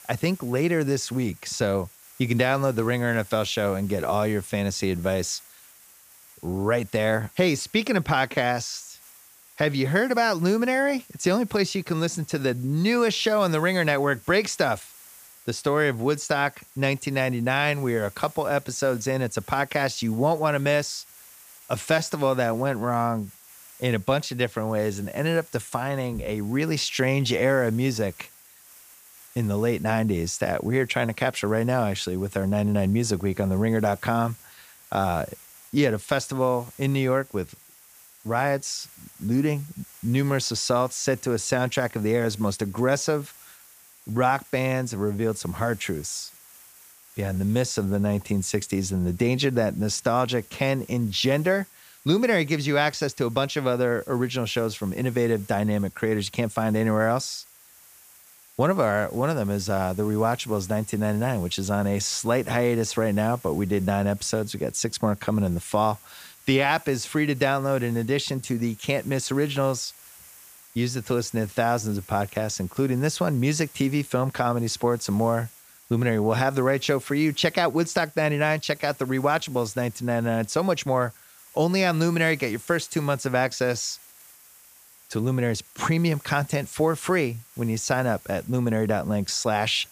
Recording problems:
hiss; faint; throughout; 20 dB below the speech

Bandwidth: 15 kHz